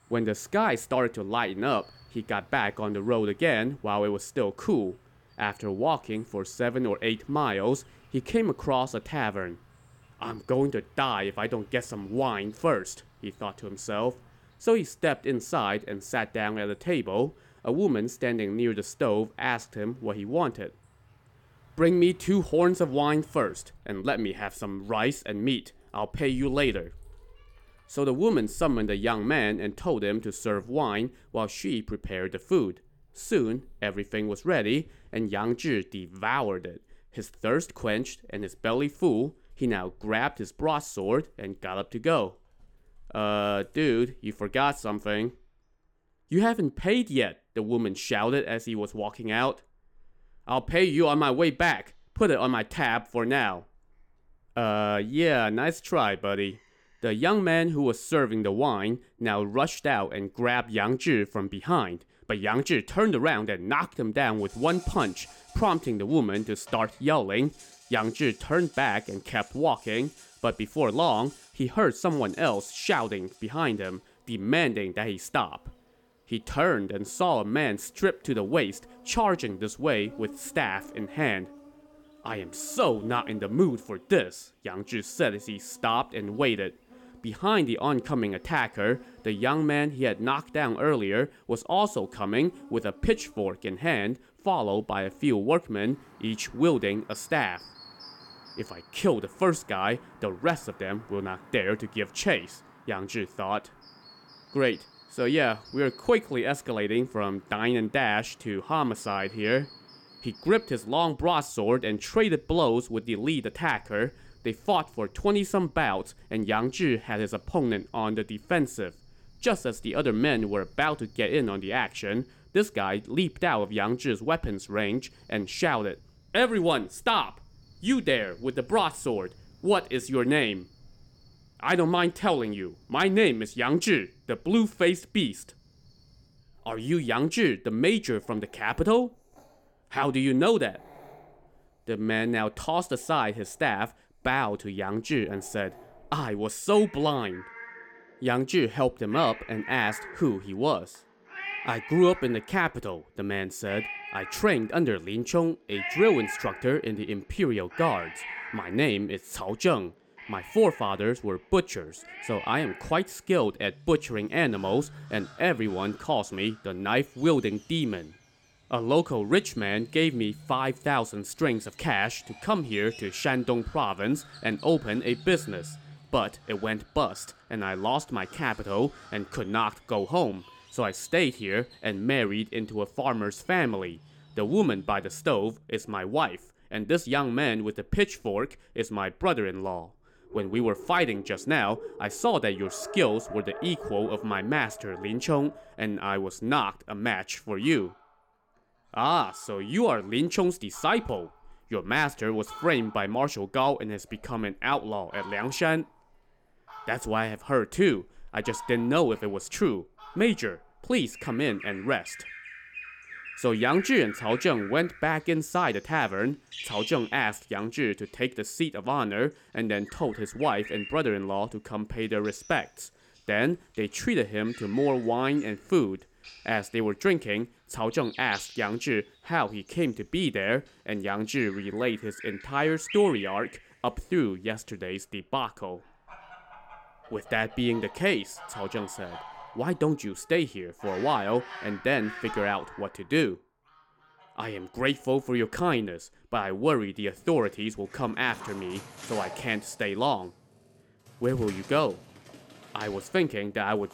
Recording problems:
animal sounds; noticeable; throughout; 20 dB below the speech

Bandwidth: 17.5 kHz